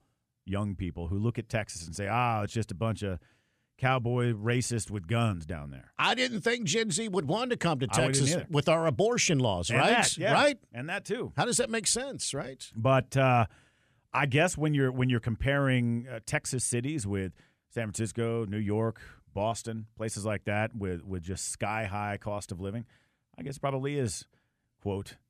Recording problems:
none

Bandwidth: 14.5 kHz